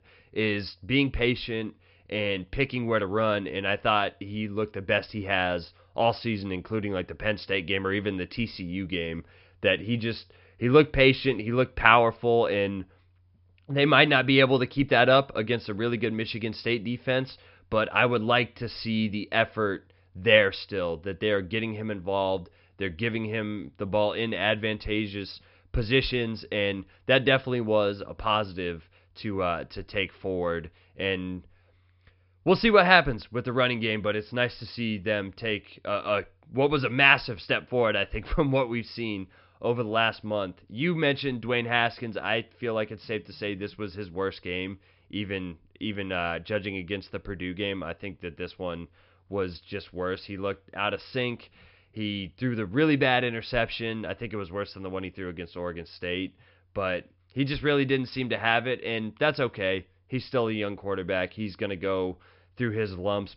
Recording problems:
high frequencies cut off; noticeable; nothing above 5.5 kHz

